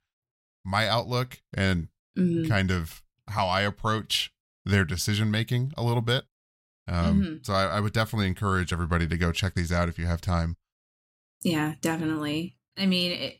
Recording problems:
none

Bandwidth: 16 kHz